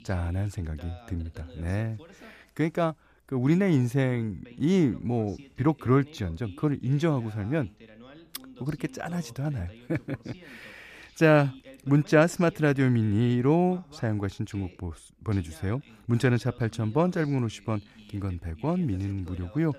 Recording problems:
voice in the background; faint; throughout; 25 dB below the speech

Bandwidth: 14.5 kHz